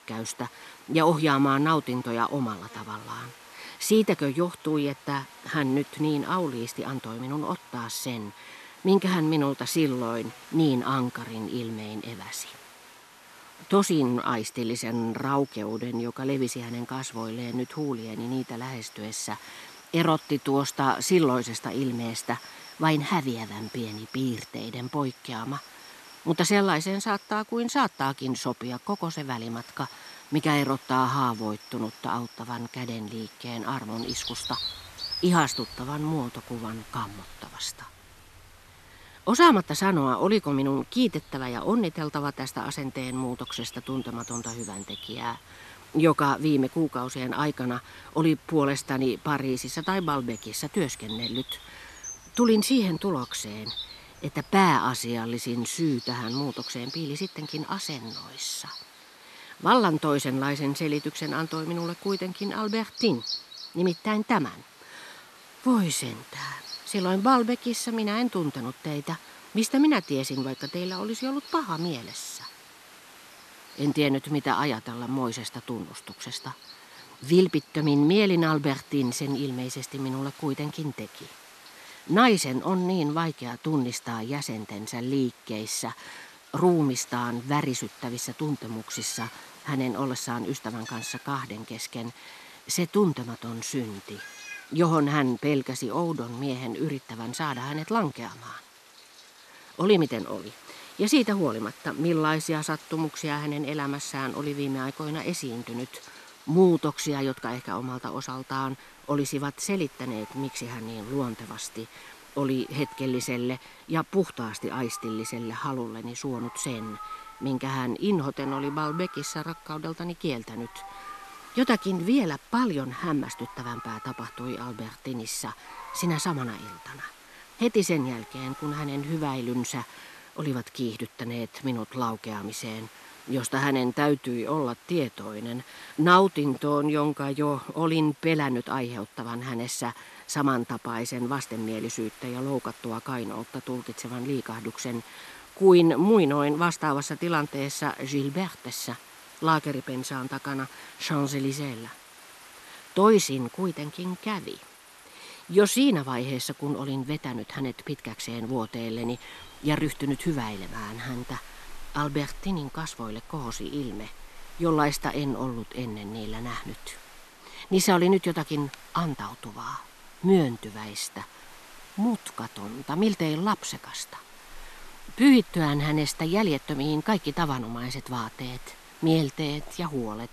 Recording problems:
animal sounds; noticeable; throughout; 15 dB below the speech
hiss; faint; throughout; 20 dB below the speech

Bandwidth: 13.5 kHz